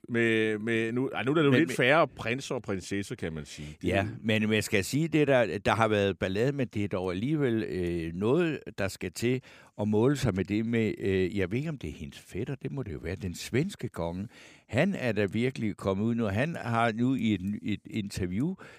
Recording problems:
none

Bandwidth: 15 kHz